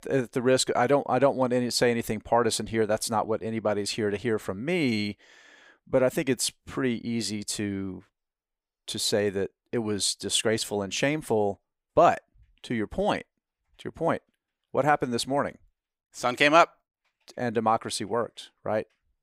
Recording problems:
none

